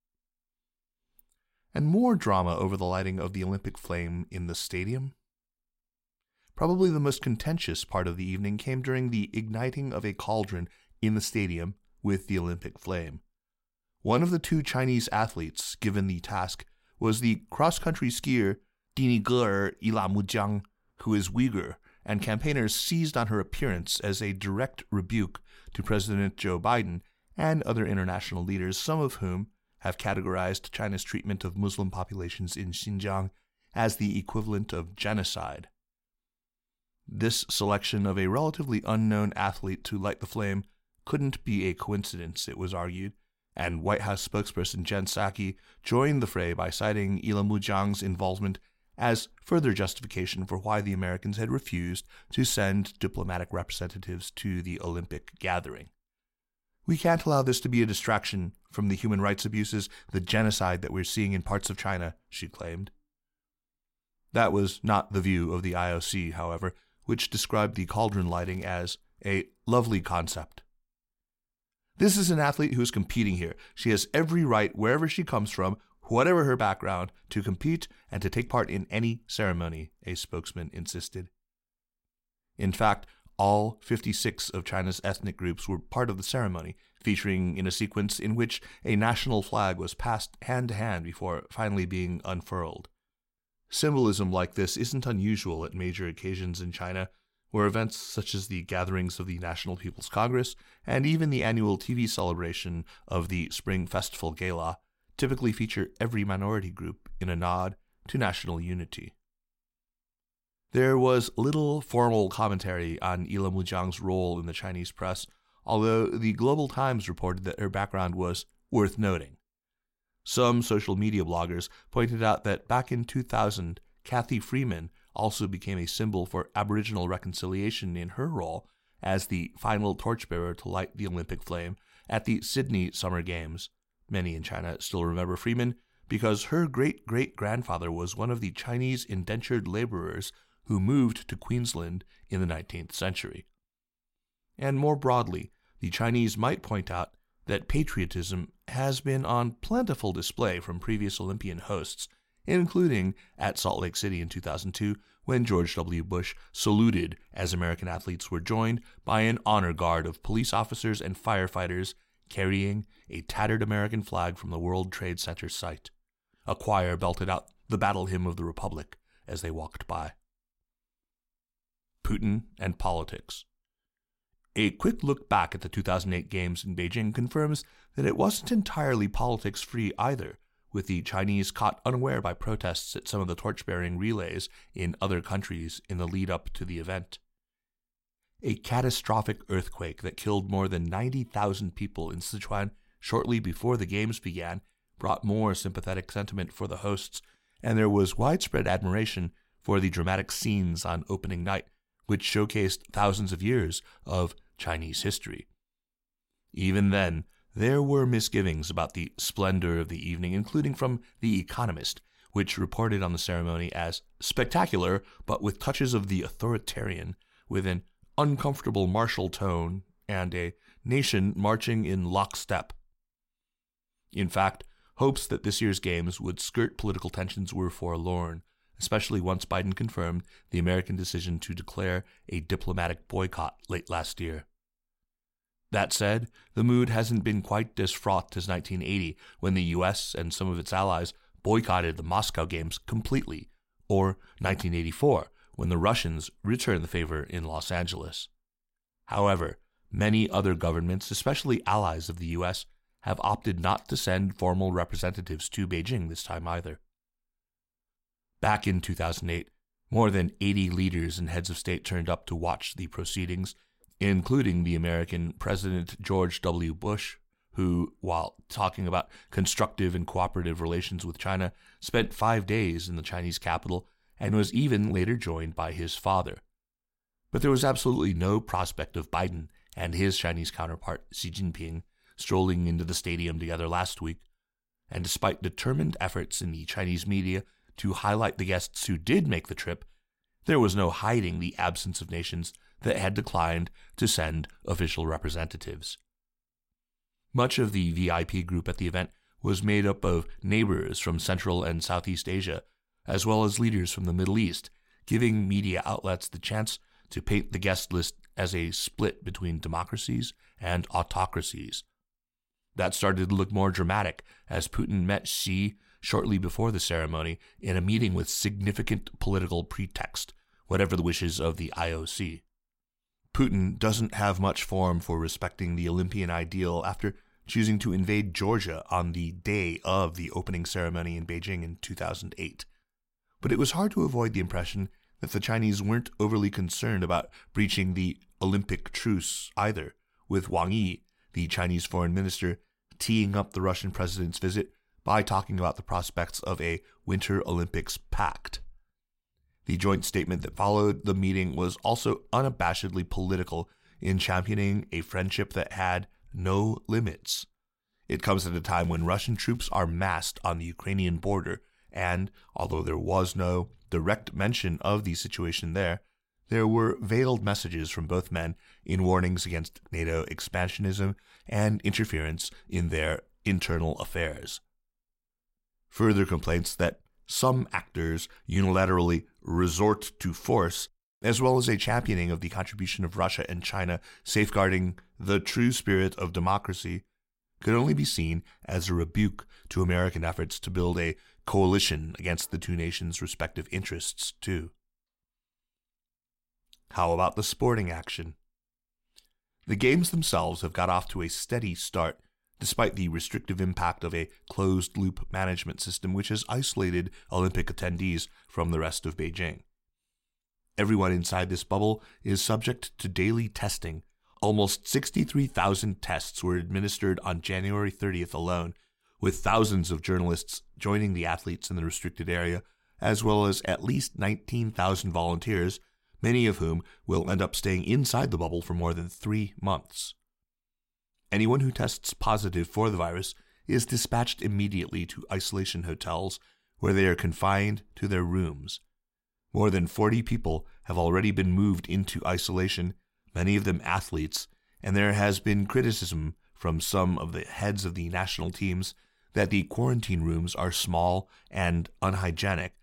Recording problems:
crackling; faint; at 1:08 and at 5:59; 30 dB below the speech

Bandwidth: 16 kHz